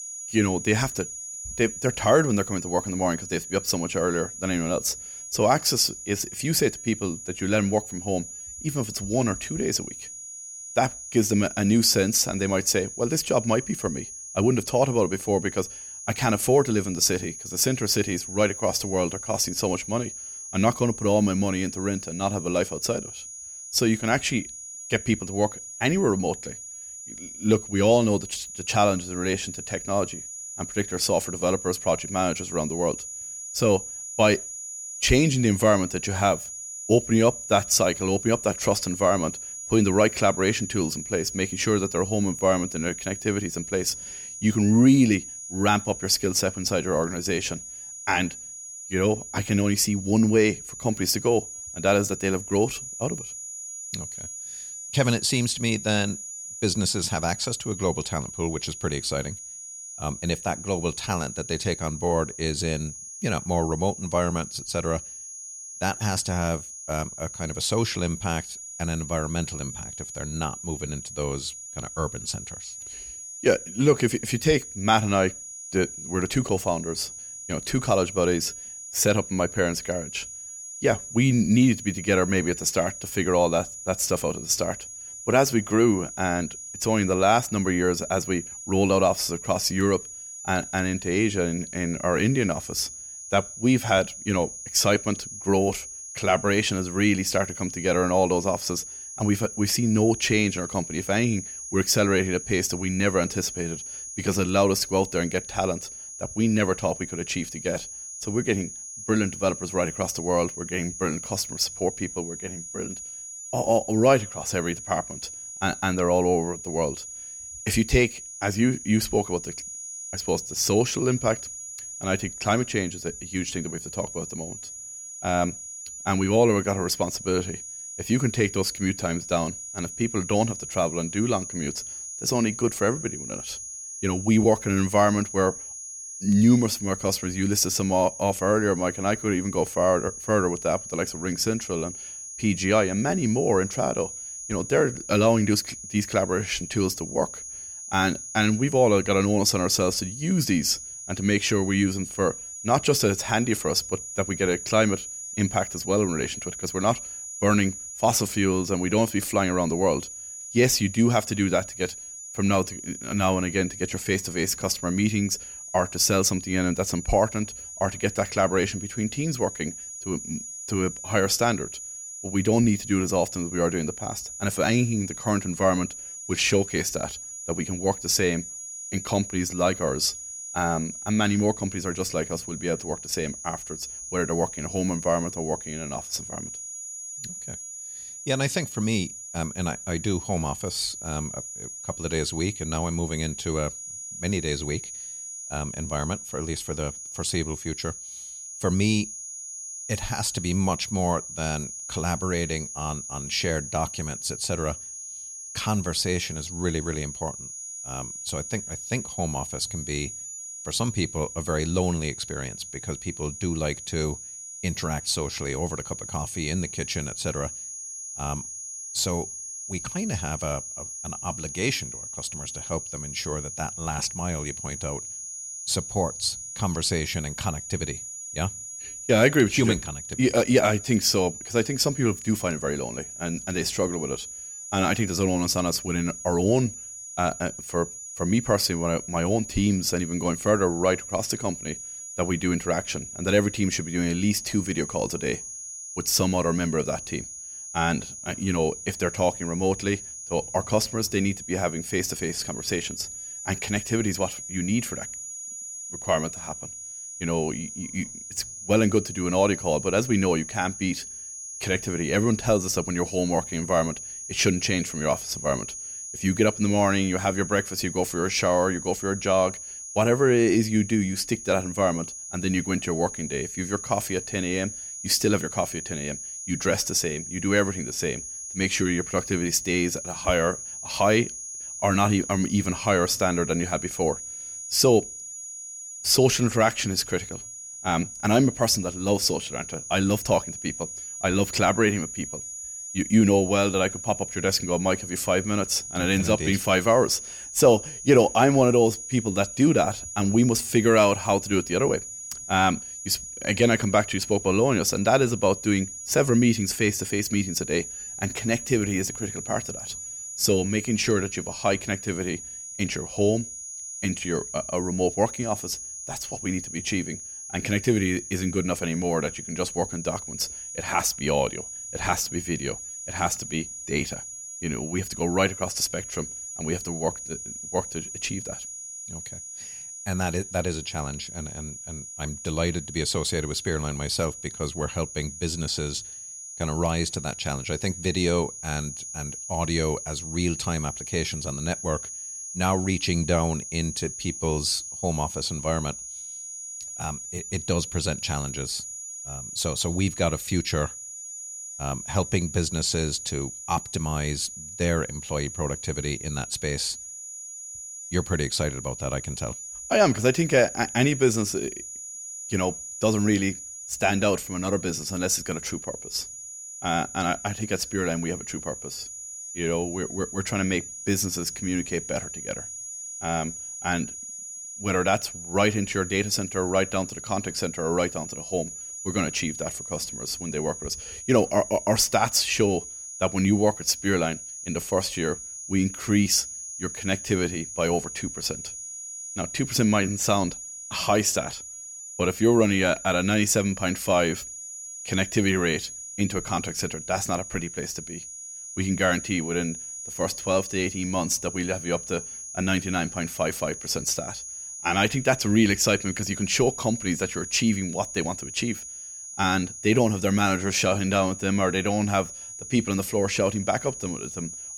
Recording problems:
high-pitched whine; loud; throughout; 7 kHz, 10 dB below the speech

